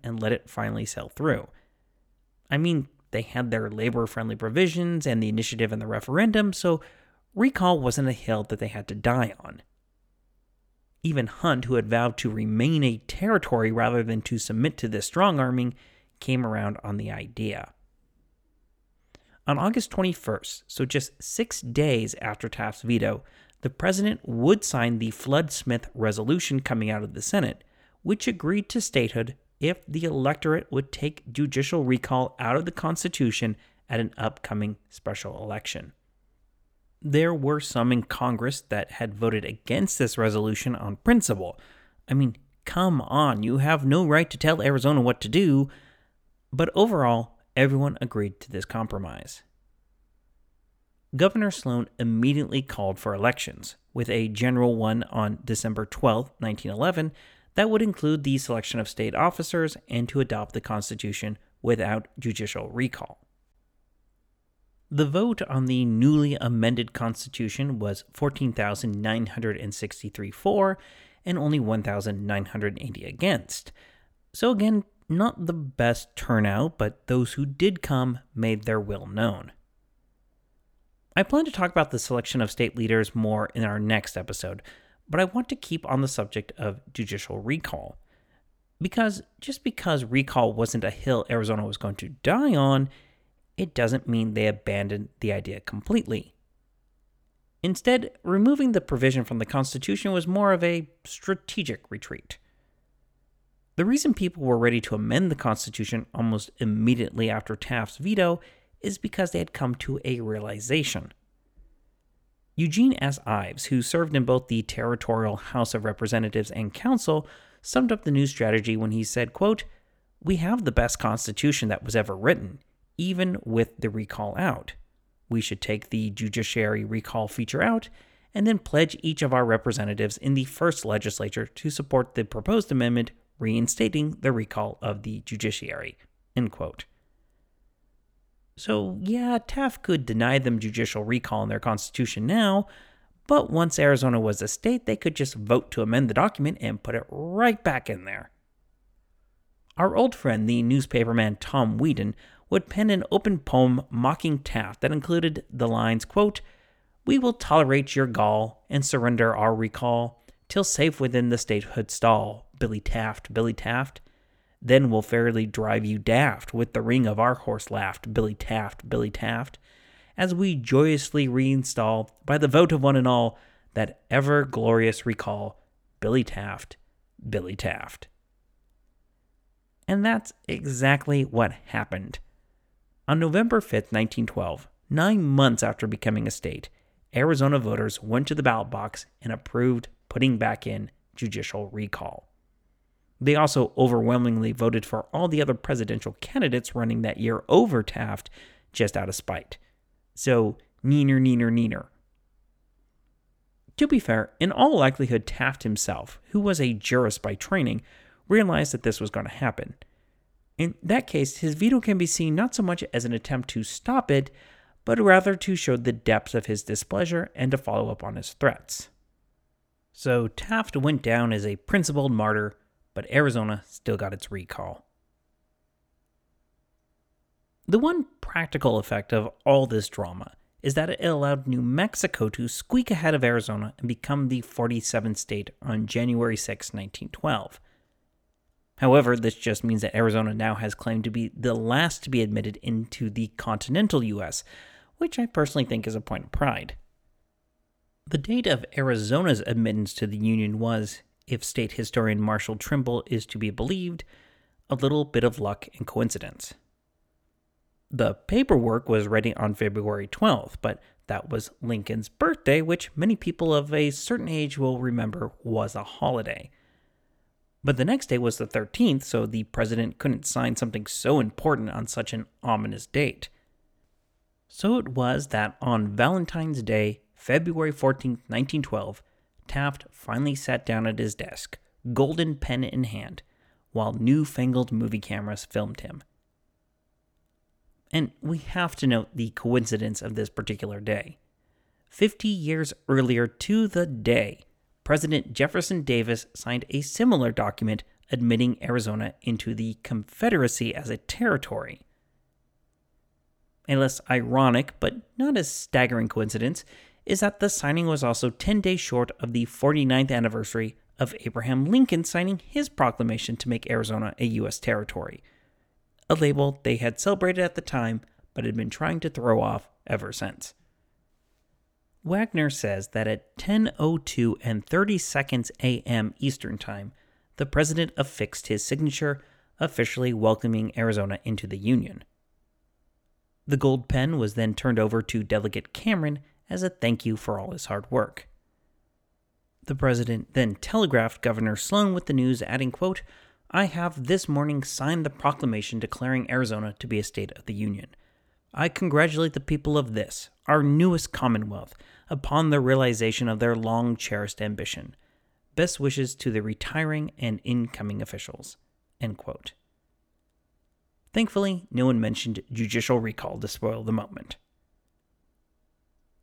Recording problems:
none

